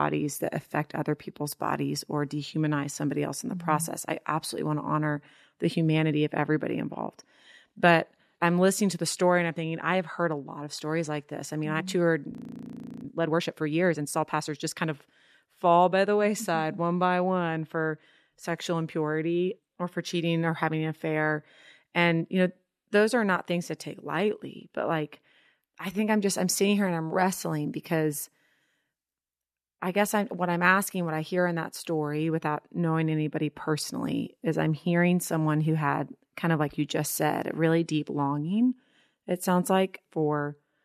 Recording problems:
abrupt cut into speech; at the start
audio freezing; at 12 s for 0.5 s

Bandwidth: 14 kHz